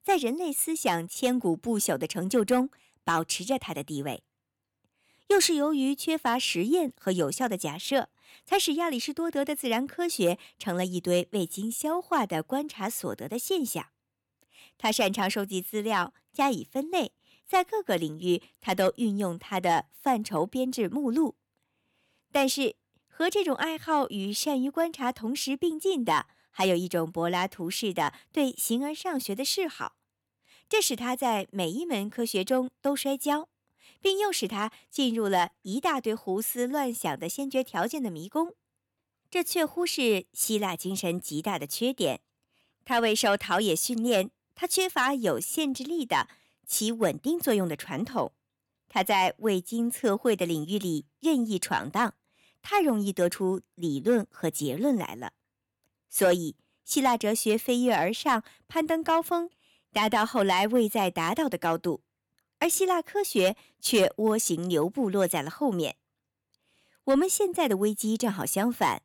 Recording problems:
none

